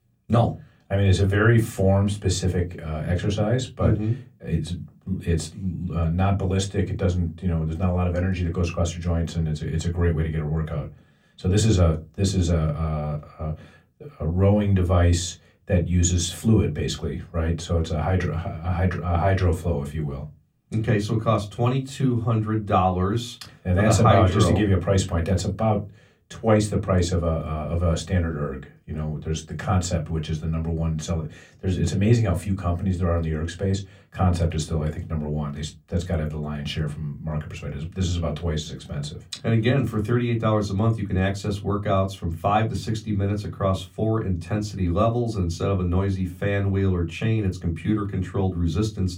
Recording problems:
room echo; very slight; dies away in 0.2 s
off-mic speech; somewhat distant

